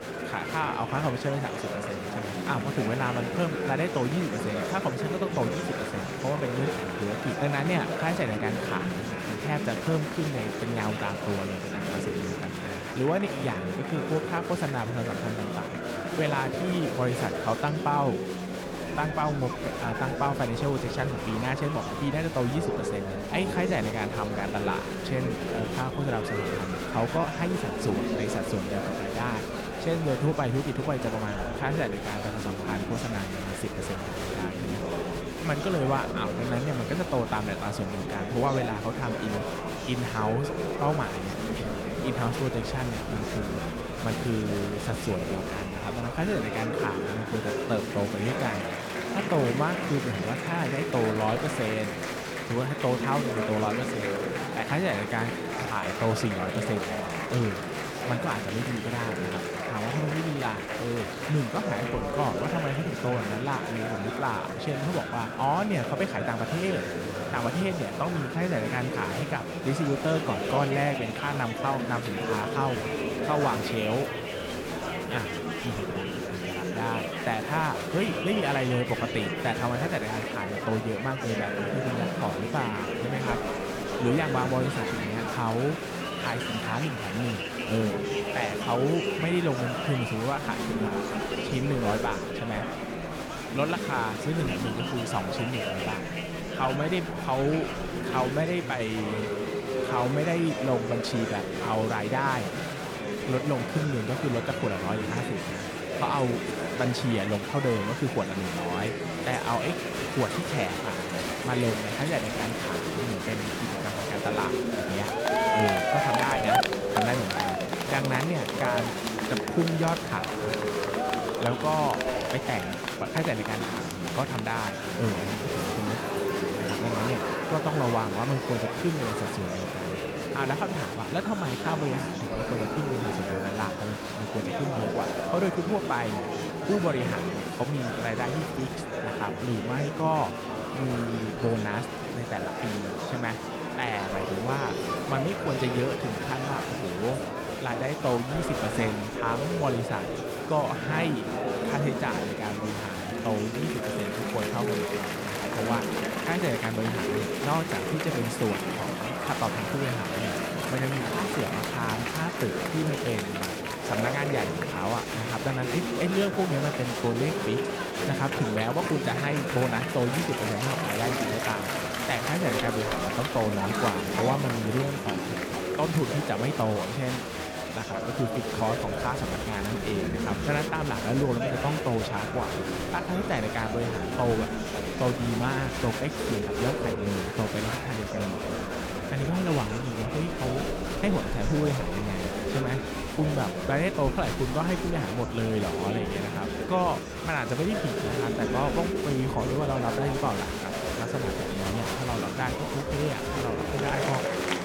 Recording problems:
murmuring crowd; loud; throughout; as loud as the speech

